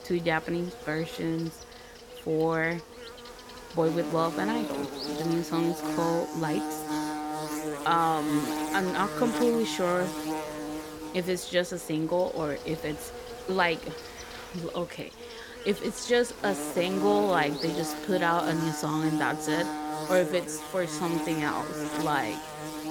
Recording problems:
electrical hum; loud; throughout; 50 Hz, 7 dB below the speech

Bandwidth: 17 kHz